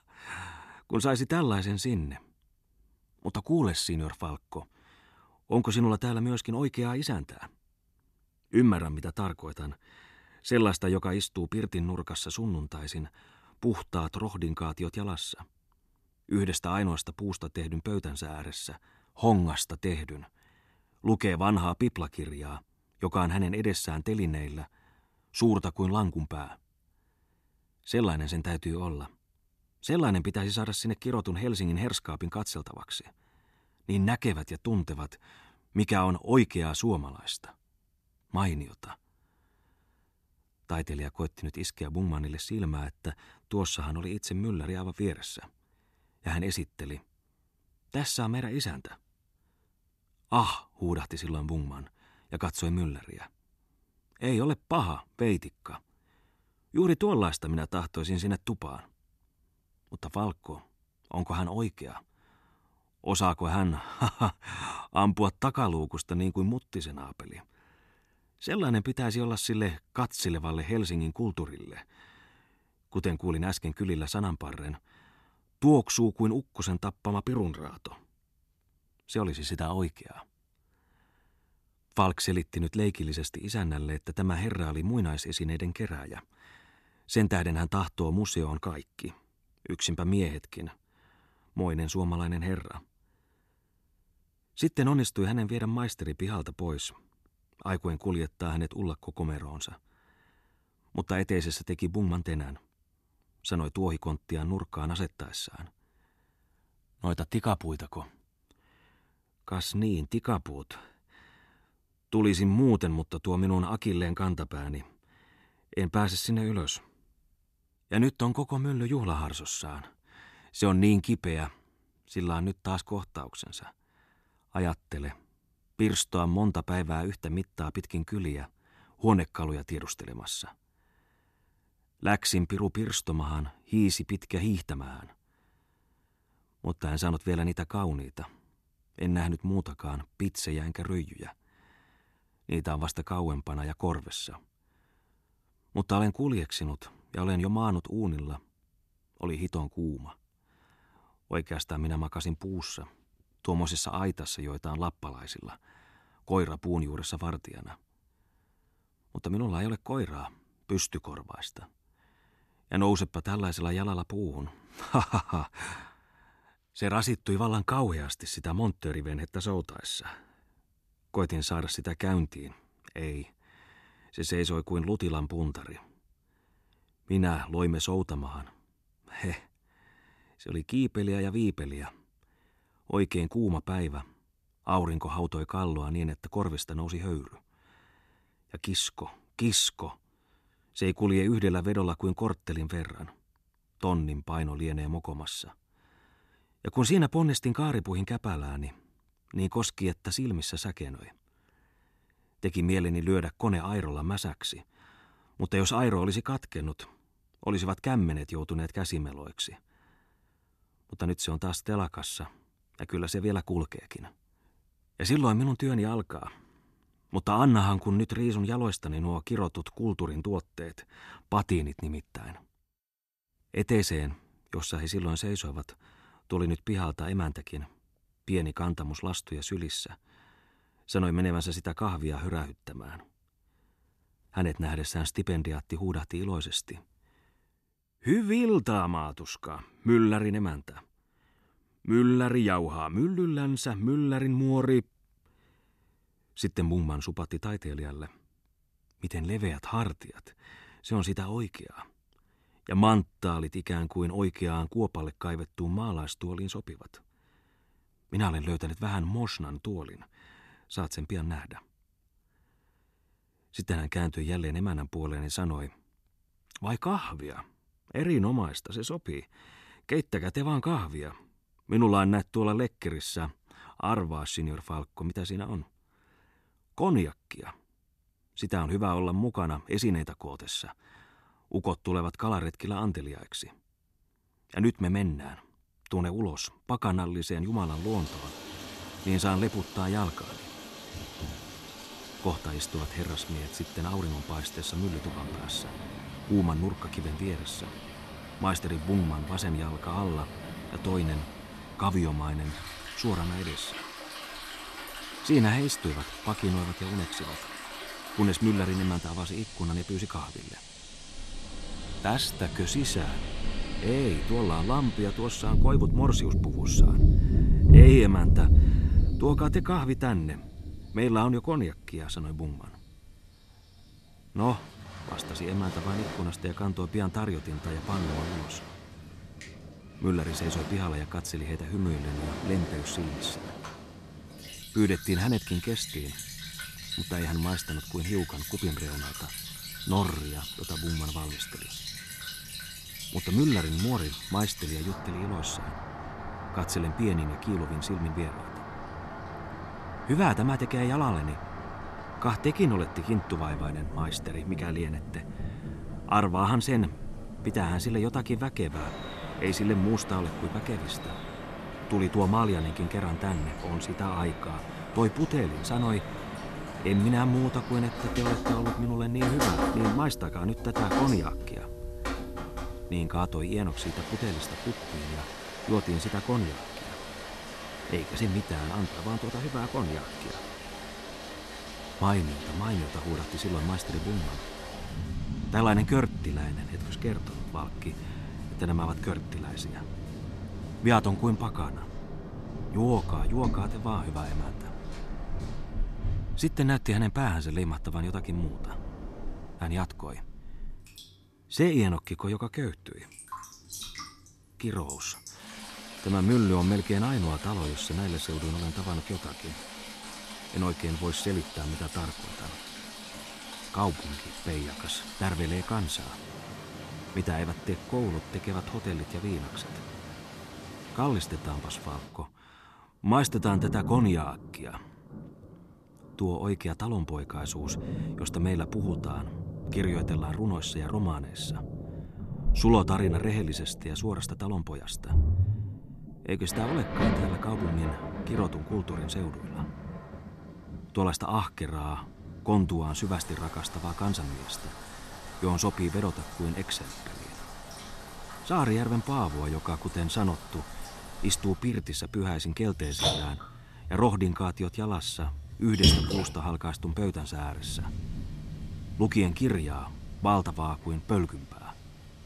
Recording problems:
rain or running water; loud; from 4:48 on; 4 dB below the speech

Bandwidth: 13.5 kHz